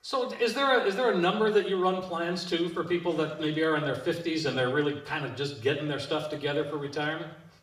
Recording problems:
off-mic speech; far
room echo; slight; dies away in 0.7 s

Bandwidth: 15 kHz